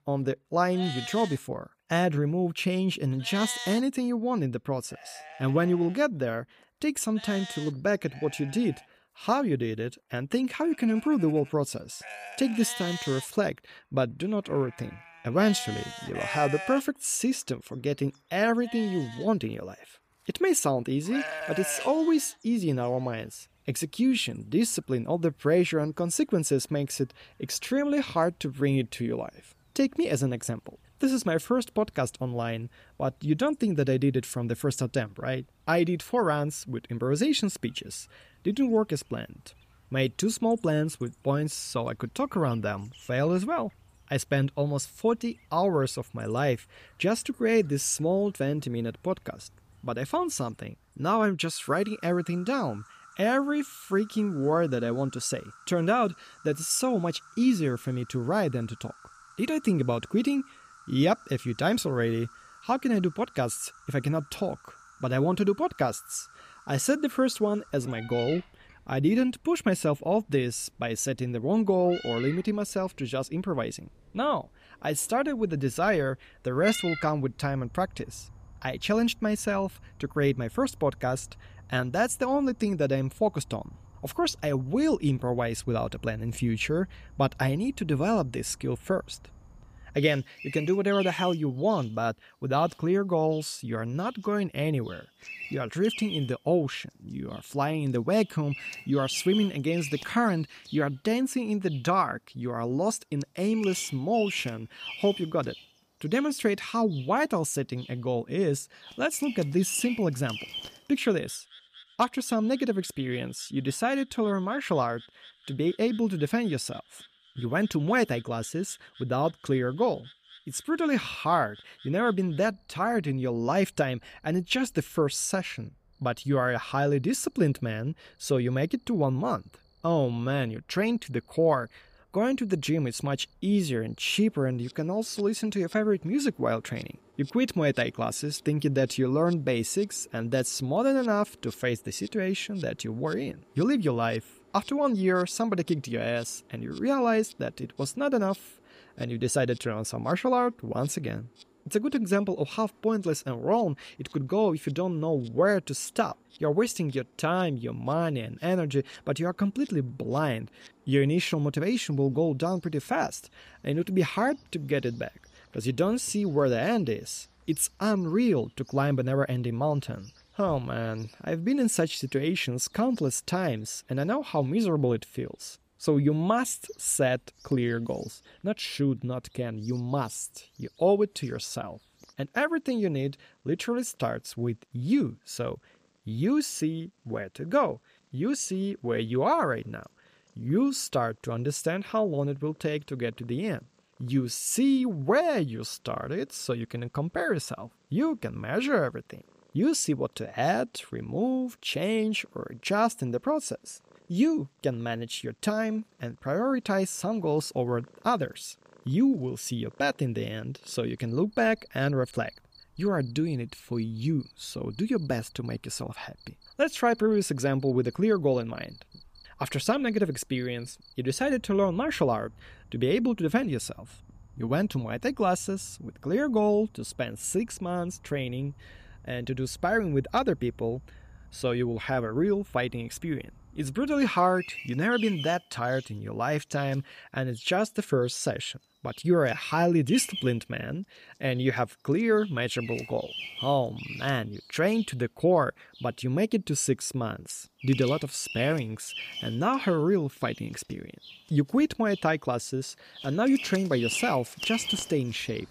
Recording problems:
animal sounds; noticeable; throughout; 15 dB below the speech

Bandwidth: 15 kHz